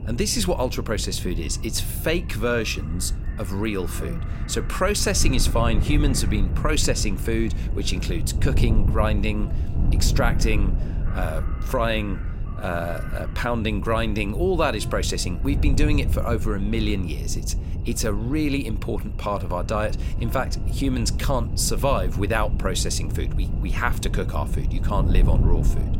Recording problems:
wind noise on the microphone; occasional gusts; 15 dB below the speech
electrical hum; faint; throughout; 50 Hz, 25 dB below the speech
animal sounds; faint; throughout; 20 dB below the speech

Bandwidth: 16 kHz